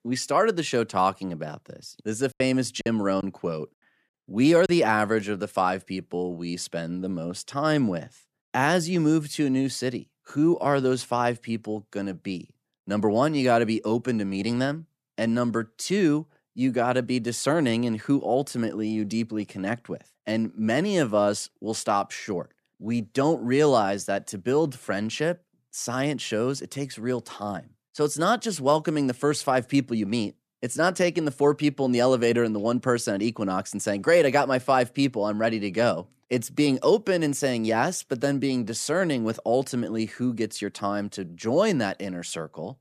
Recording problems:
choppy; very; from 2.5 to 4.5 s; 6% of the speech affected

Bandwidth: 14.5 kHz